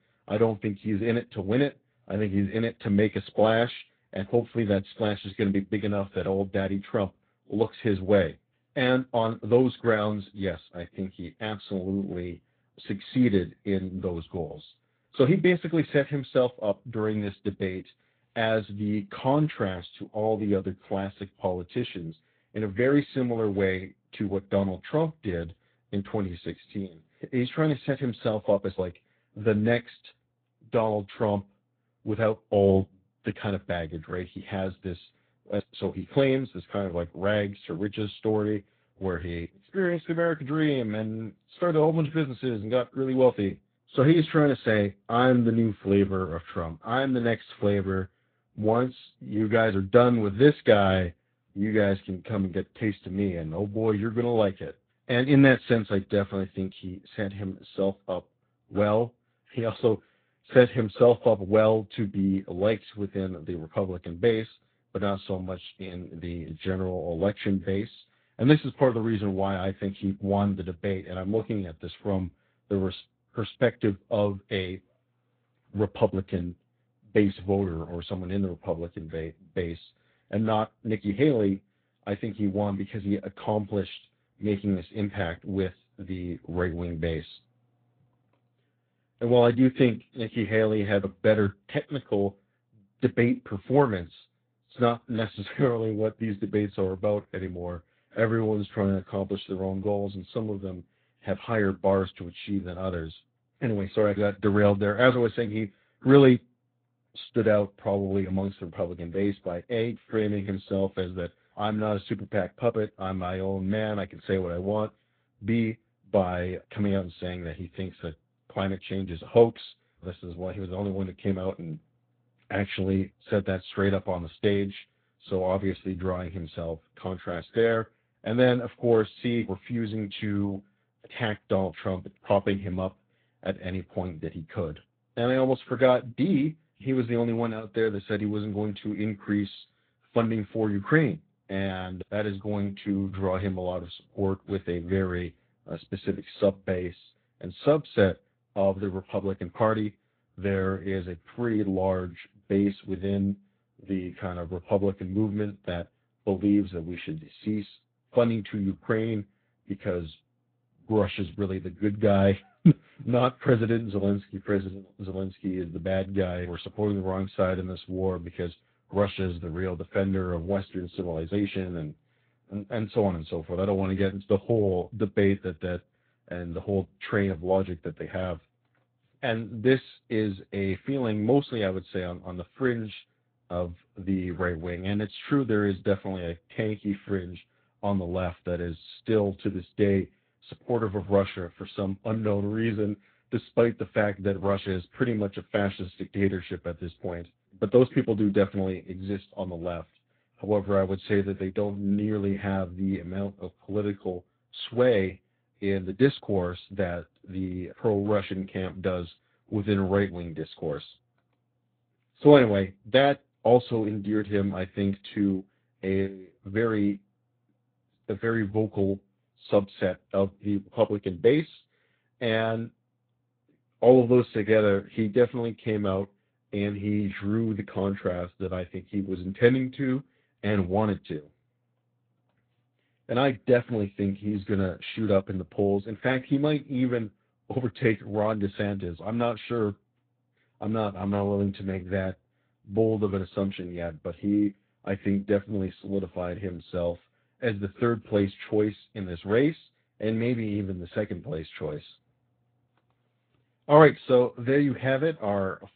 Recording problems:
high frequencies cut off; severe; nothing above 4 kHz
garbled, watery; slightly

